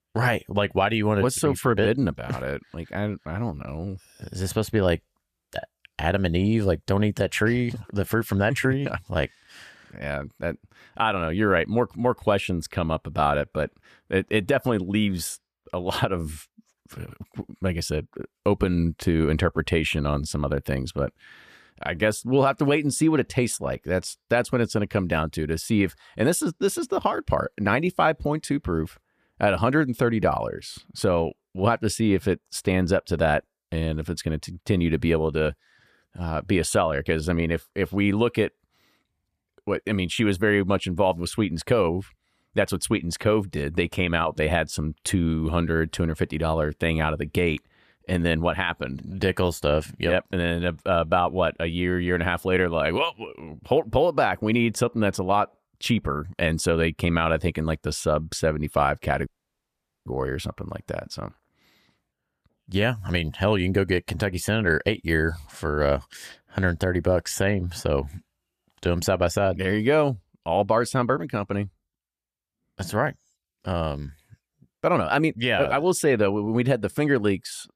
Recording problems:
audio cutting out; at 59 s for 1 s

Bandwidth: 14.5 kHz